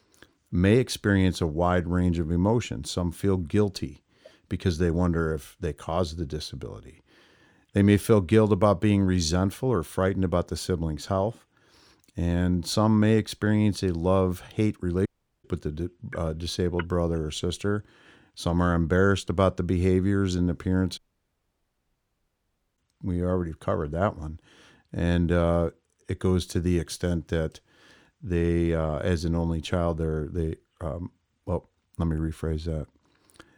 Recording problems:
audio cutting out; at 15 s and at 21 s for 2 s

